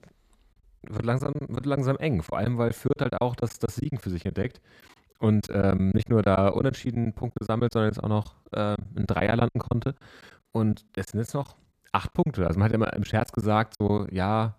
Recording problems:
choppy; very; 13% of the speech affected

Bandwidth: 14.5 kHz